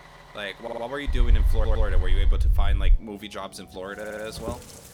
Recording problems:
rain or running water; noticeable; throughout; 10 dB below the speech
traffic noise; noticeable; throughout; 10 dB below the speech
low rumble; very faint; from 1 to 3 s; 15 dB below the speech
audio stuttering; at 0.5 s, at 1.5 s and at 4 s

